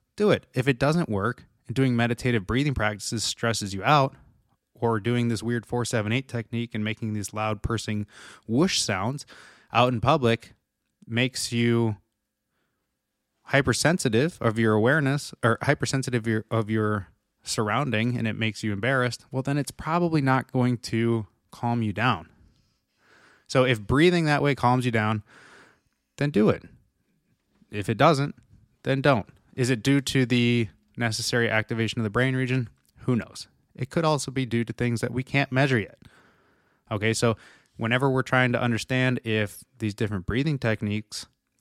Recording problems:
none

